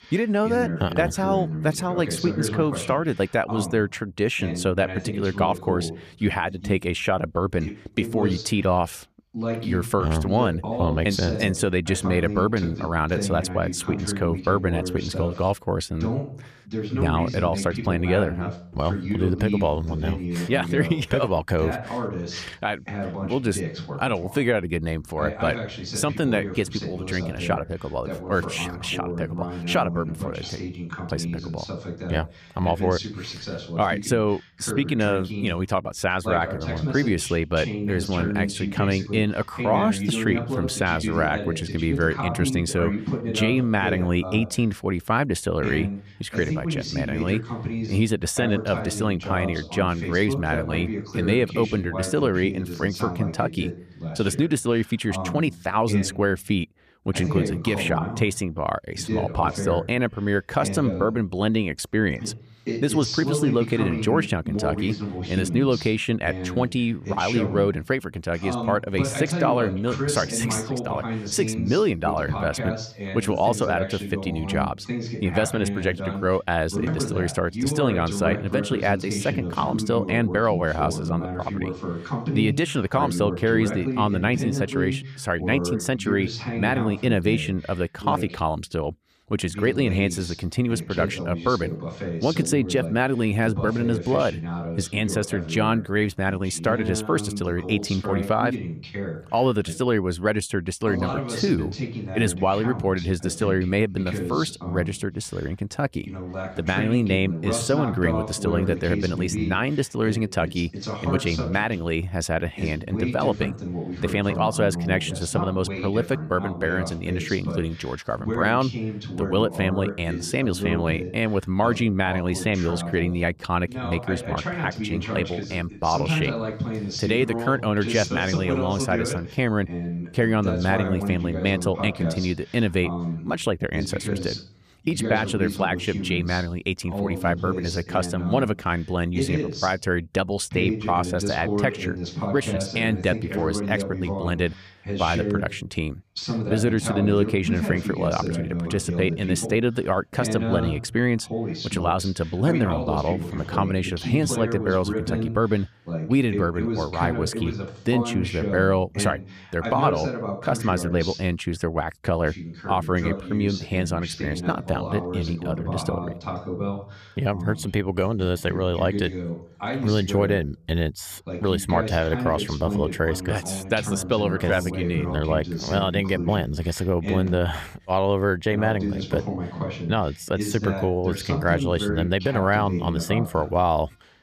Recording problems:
voice in the background; loud; throughout; 6 dB below the speech

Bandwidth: 14.5 kHz